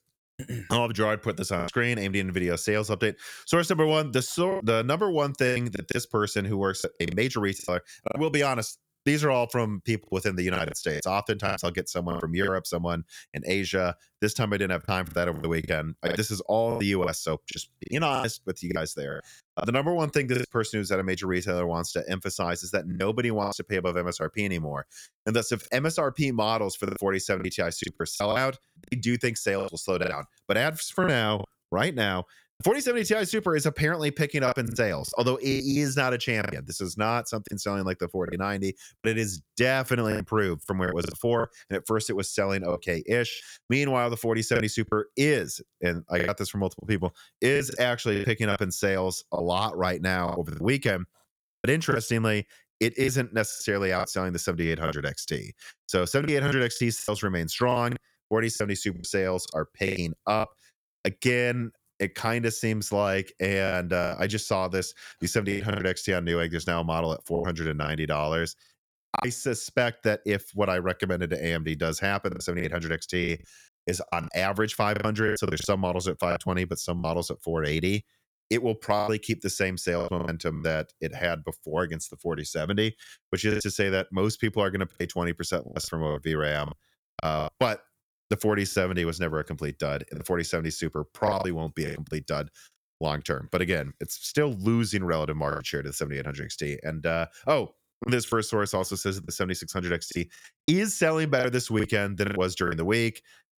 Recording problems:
choppy; very; 8% of the speech affected

